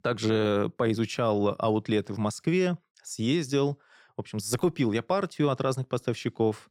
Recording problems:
none

